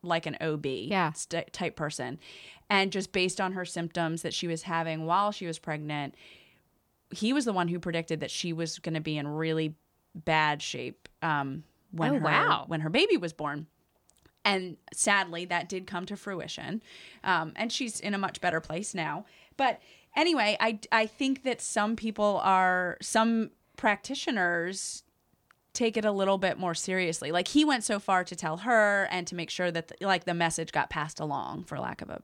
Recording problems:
none

